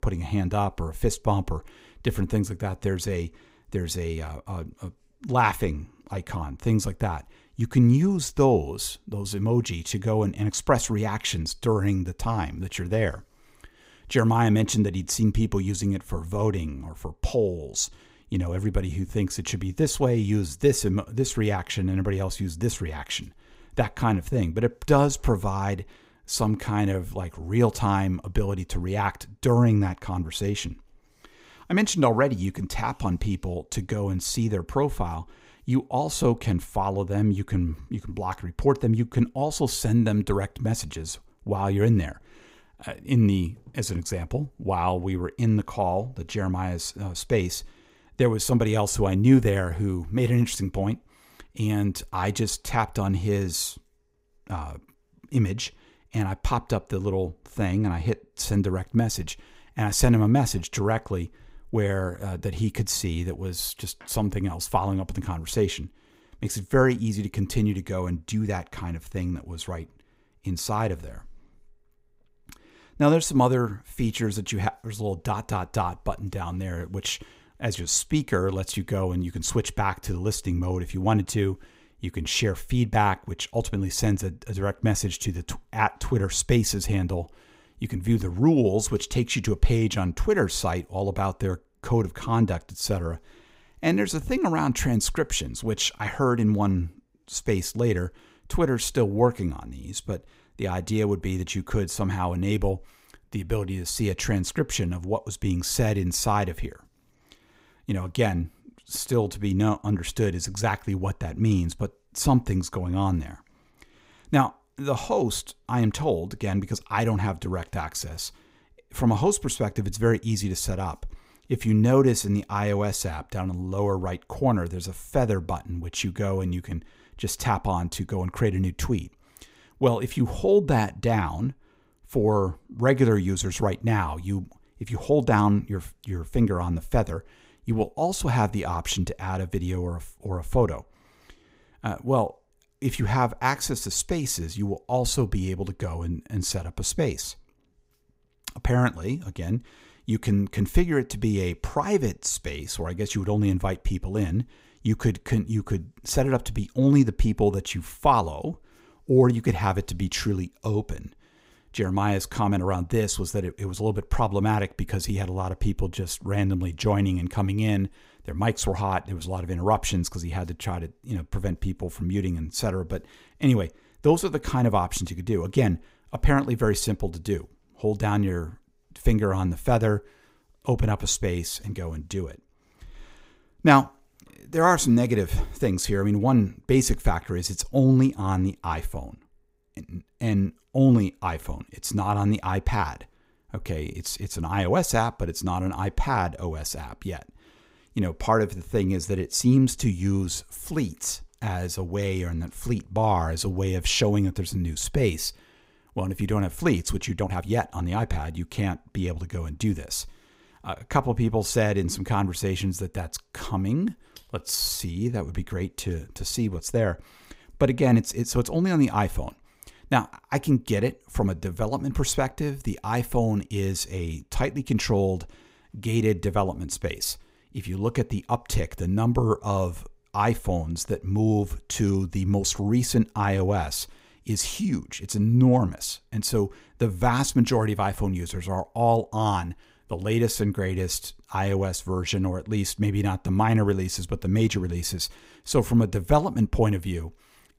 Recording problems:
uneven, jittery; strongly; from 1:26 to 3:35

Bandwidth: 15.5 kHz